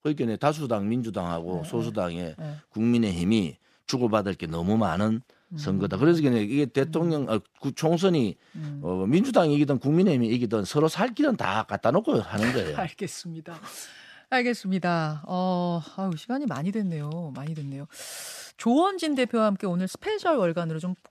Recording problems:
none

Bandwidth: 14.5 kHz